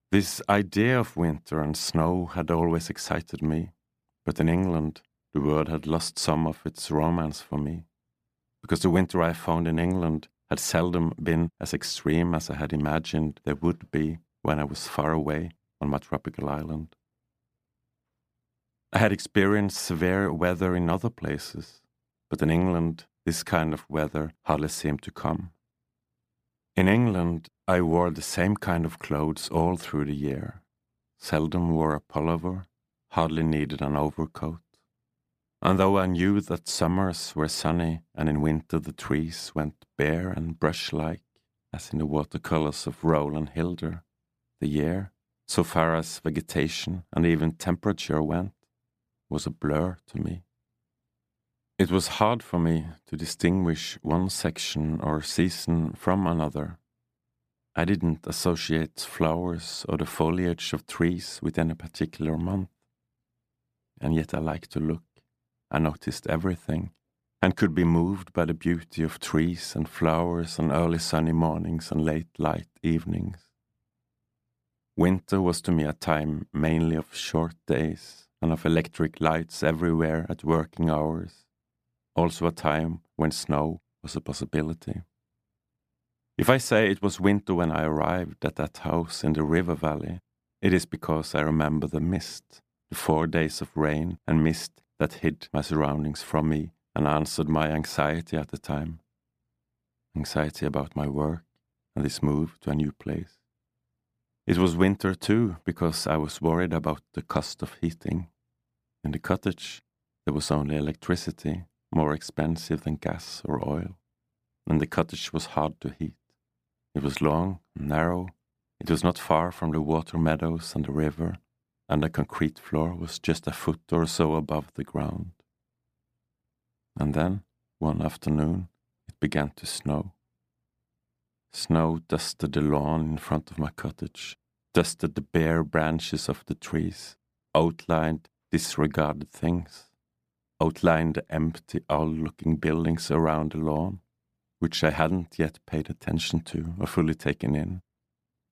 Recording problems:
none

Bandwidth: 15 kHz